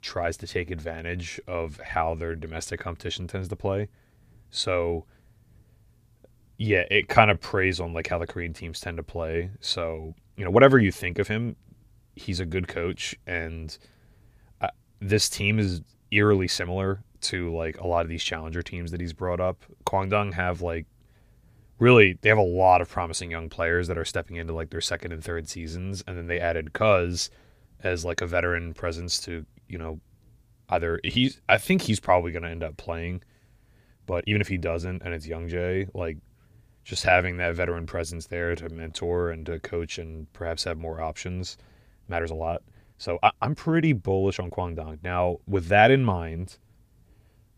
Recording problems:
uneven, jittery; strongly; from 1.5 to 46 s

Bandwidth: 15 kHz